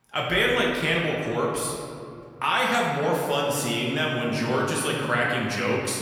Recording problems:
off-mic speech; far
room echo; noticeable; dies away in 2.1 s

